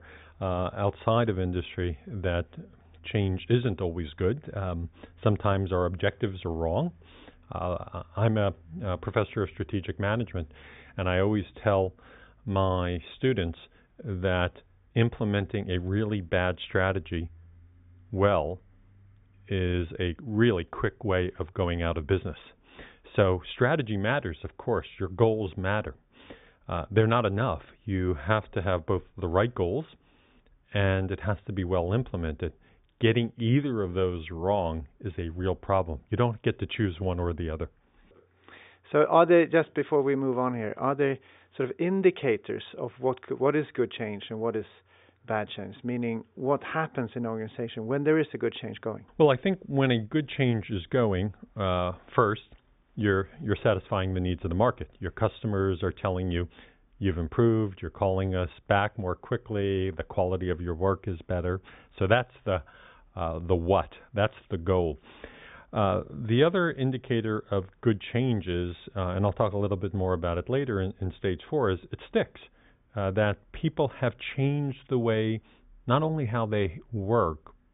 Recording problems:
high frequencies cut off; severe; nothing above 3.5 kHz

